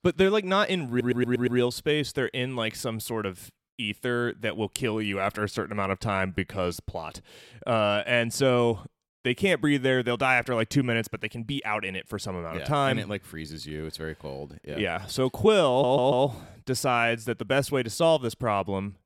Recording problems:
audio stuttering; at 1 s and at 16 s

